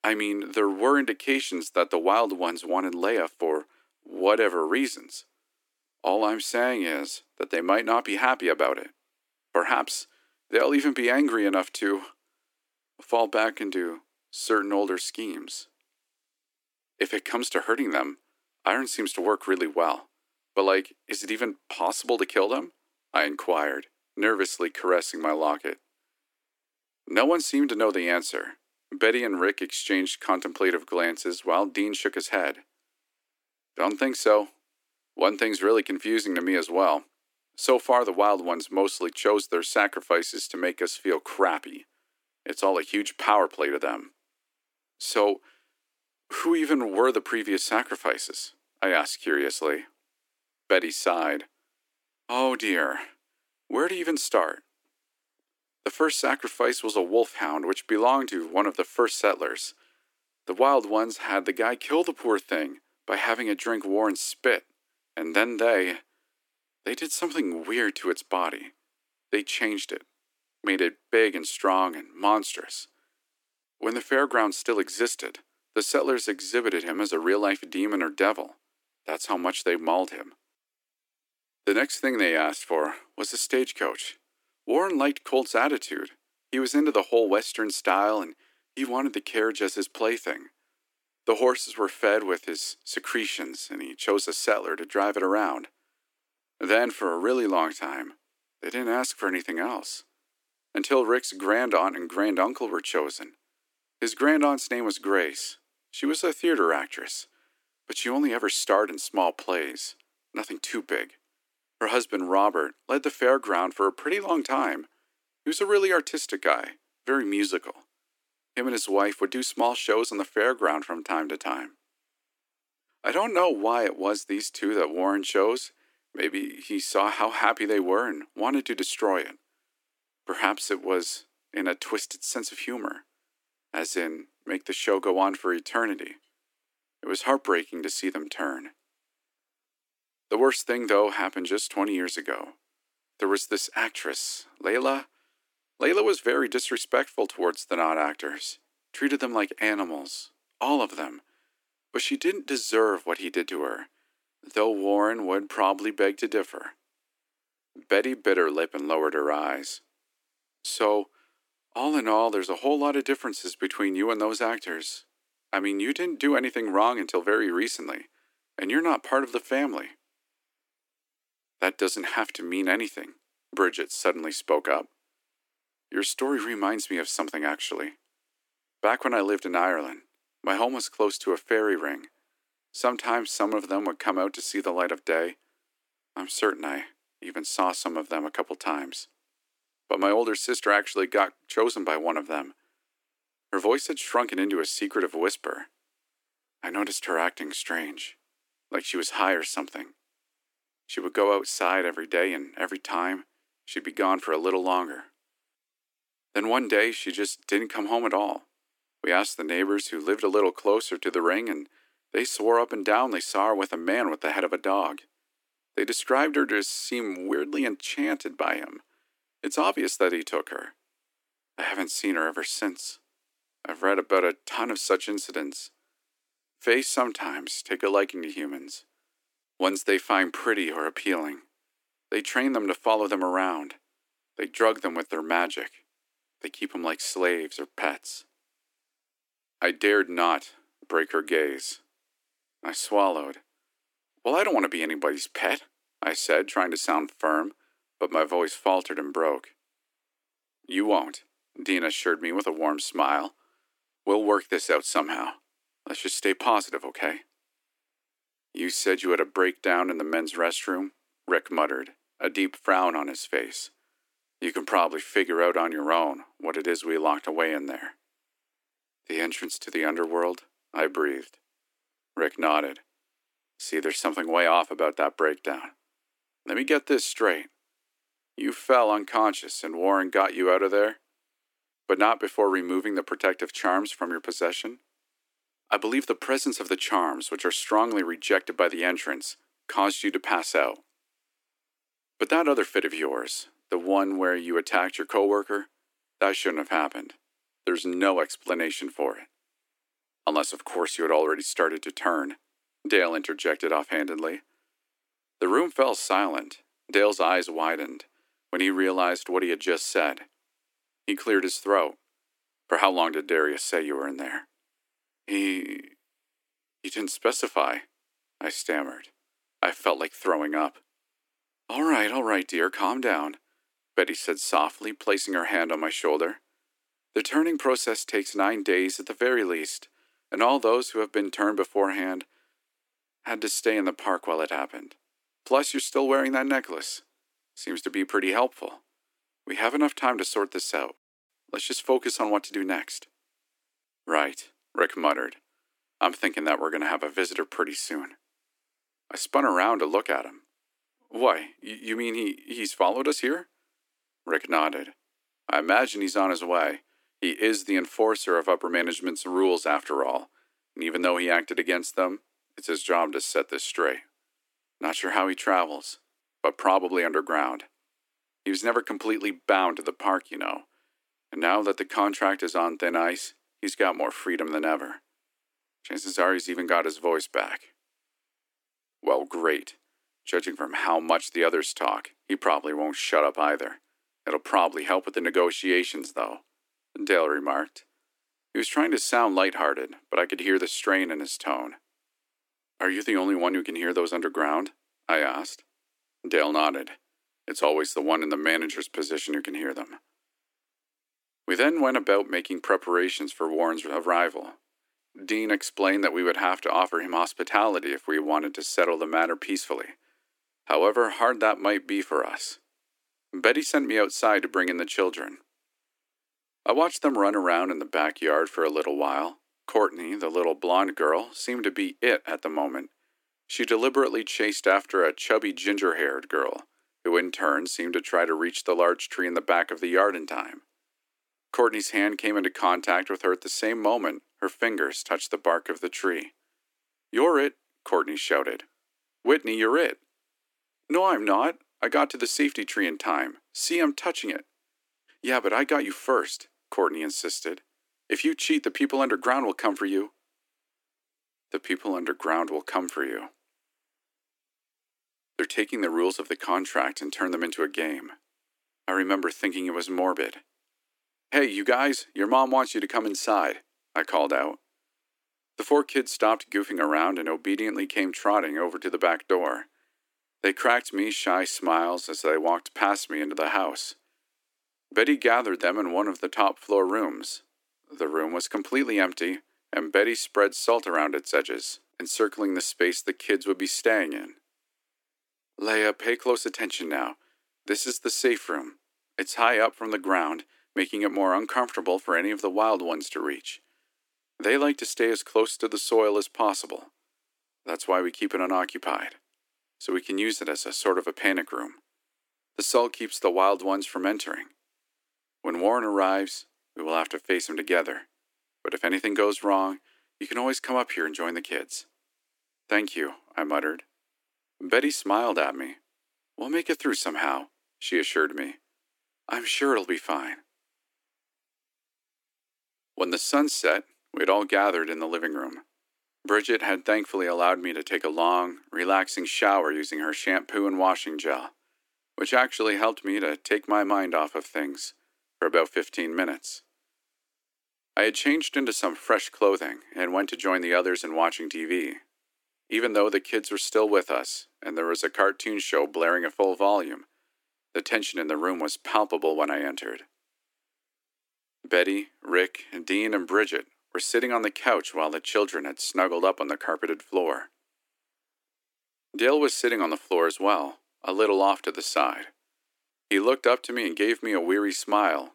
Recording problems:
thin; somewhat; fading below 300 Hz

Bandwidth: 17 kHz